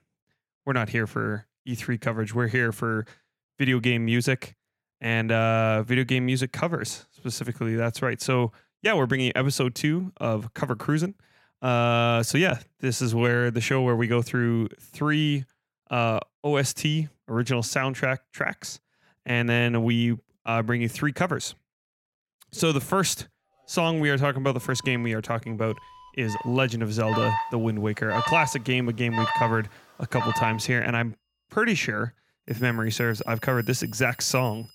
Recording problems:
alarms or sirens; loud; from 24 s on; 6 dB below the speech

